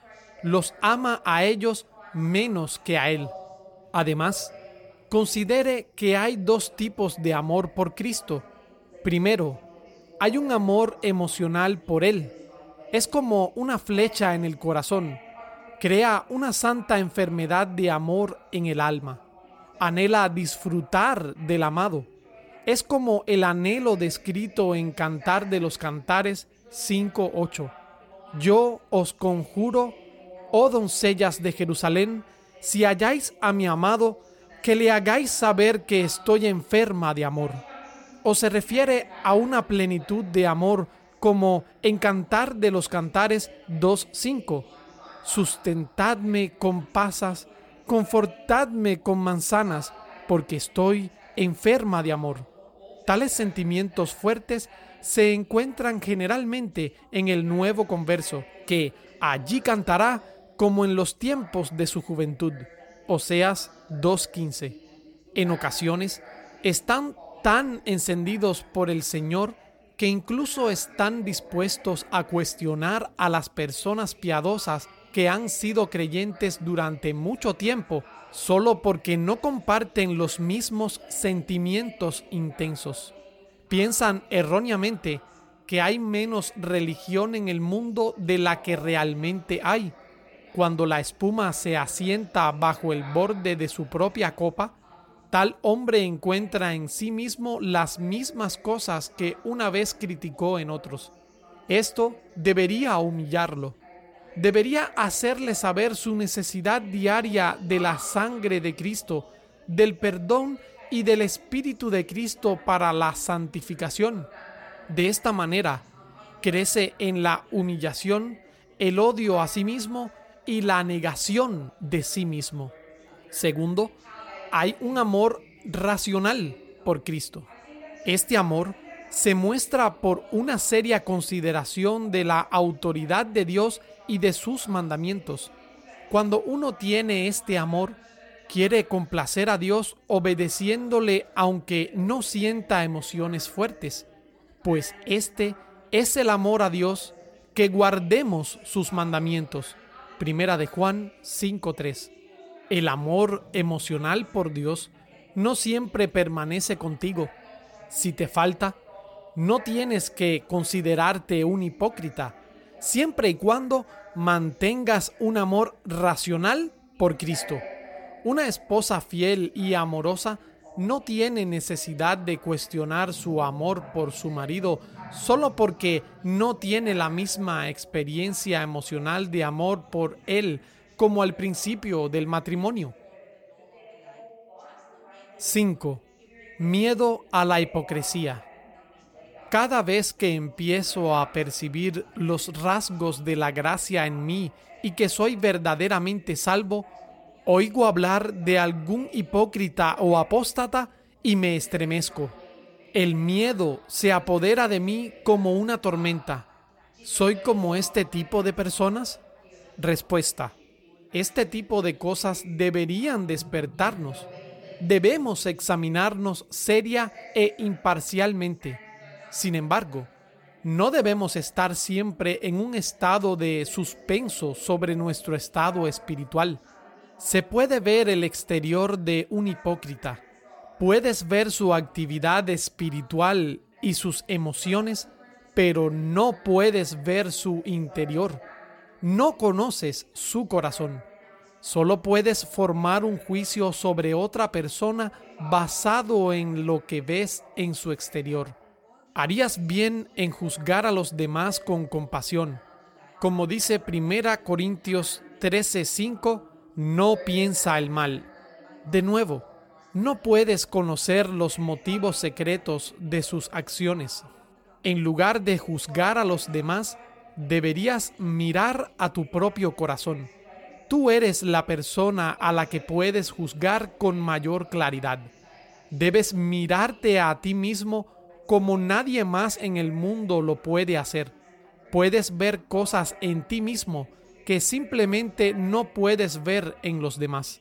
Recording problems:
background chatter; faint; throughout; 3 voices, 25 dB below the speech

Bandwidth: 17 kHz